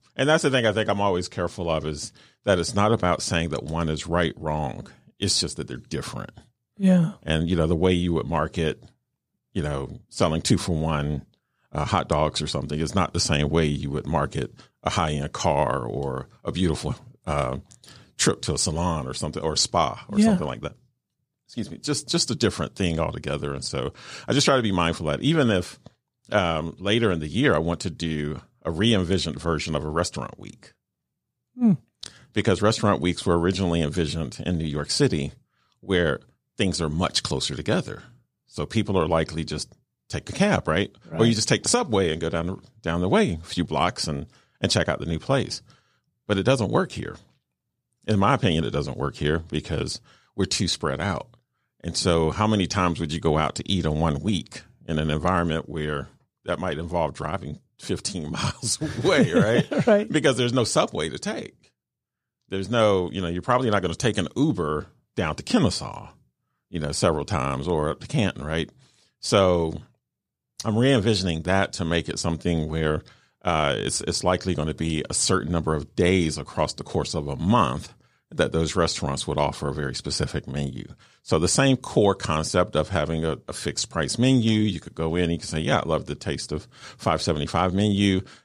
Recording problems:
none

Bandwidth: 15 kHz